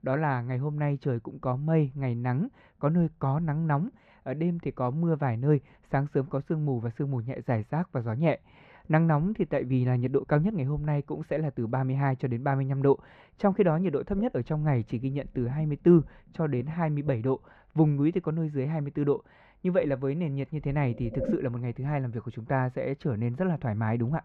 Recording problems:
muffled; very; fading above 3 kHz

